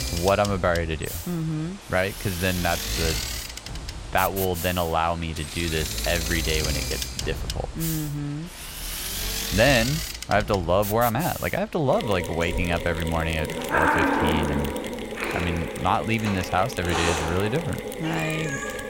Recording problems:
animal sounds; loud; throughout; 6 dB below the speech
machinery noise; loud; throughout; 5 dB below the speech

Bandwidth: 16 kHz